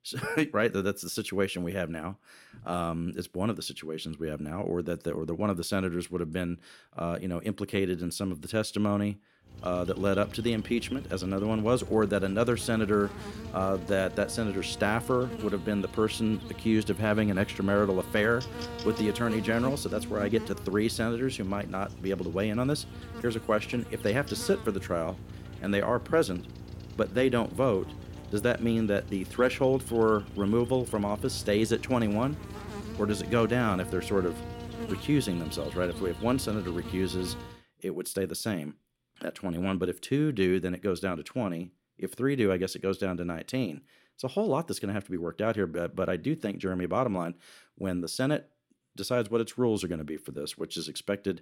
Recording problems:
electrical hum; noticeable; from 9.5 to 38 s; 60 Hz, 15 dB below the speech

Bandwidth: 16.5 kHz